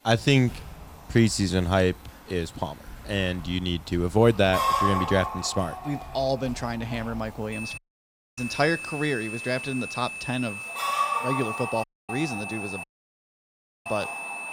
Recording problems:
high-pitched whine; loud; from 7.5 s on; 2.5 kHz, 8 dB below the speech
animal sounds; loud; throughout; 4 dB below the speech
household noises; faint; throughout; 20 dB below the speech
audio cutting out; at 8 s for 0.5 s, at 12 s and at 13 s for 1 s

